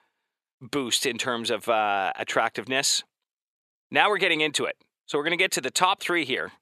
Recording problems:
thin; somewhat; fading below 350 Hz

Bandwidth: 13.5 kHz